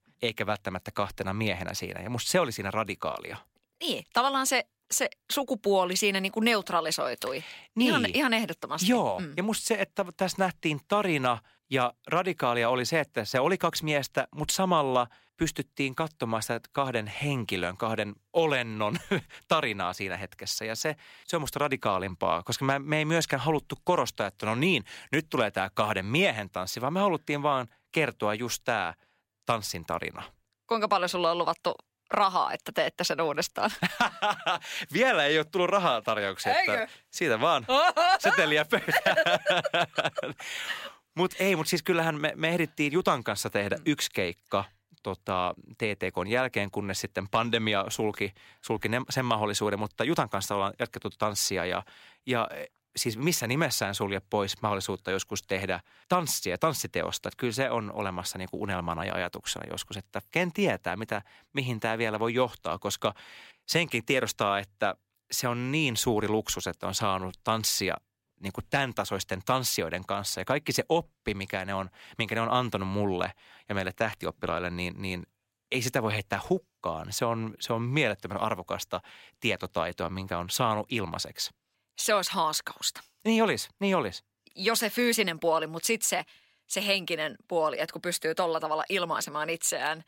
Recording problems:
none

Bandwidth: 16 kHz